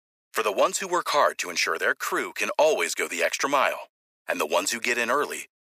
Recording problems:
thin; very; fading below 500 Hz

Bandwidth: 15 kHz